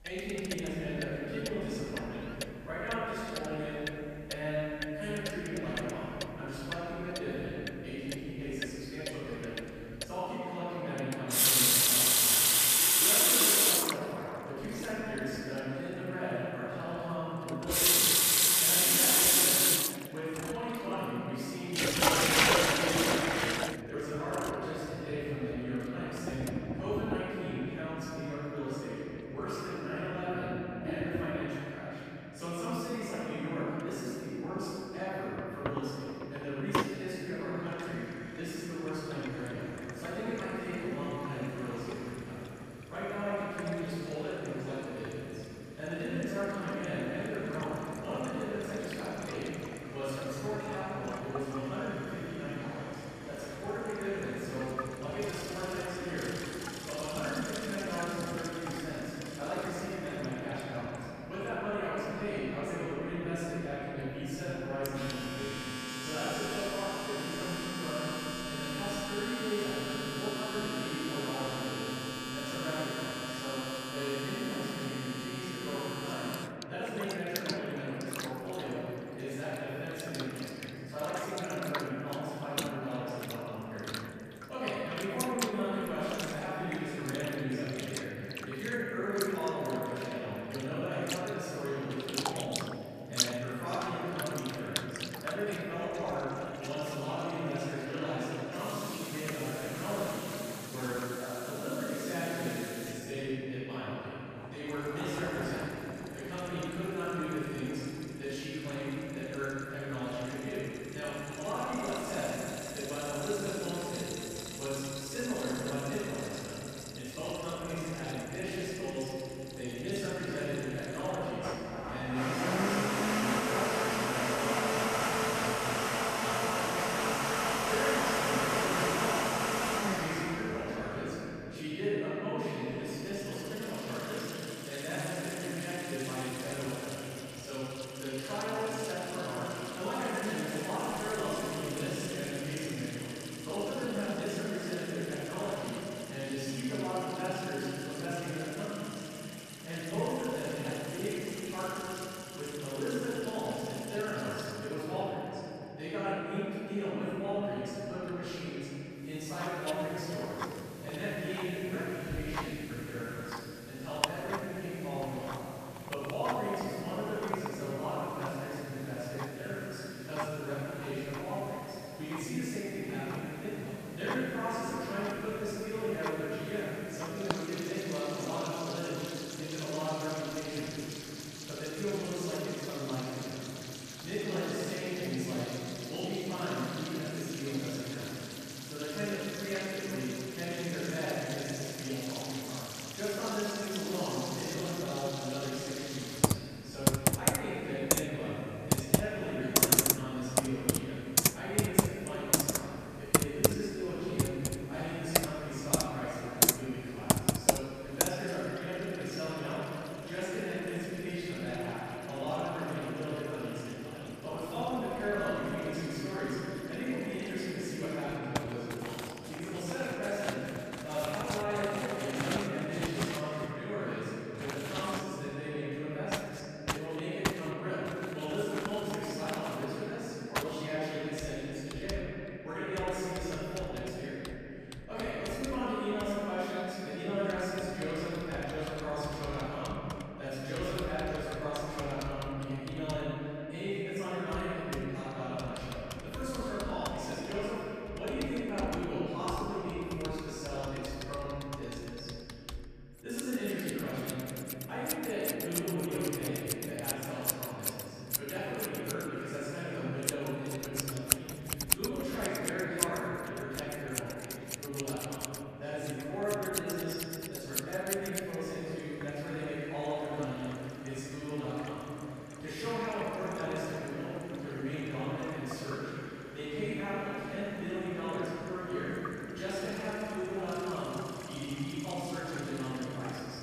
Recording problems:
room echo; strong; dies away in 3 s
off-mic speech; far
household noises; very loud; throughout; 3 dB above the speech
traffic noise; very faint; throughout; 20 dB below the speech

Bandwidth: 14.5 kHz